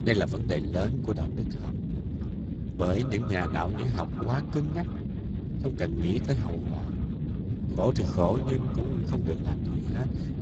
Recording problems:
garbled, watery; badly; nothing above 7.5 kHz
echo of what is said; noticeable; from 2 s on; 190 ms later, 15 dB below the speech
low rumble; loud; throughout; 8 dB below the speech

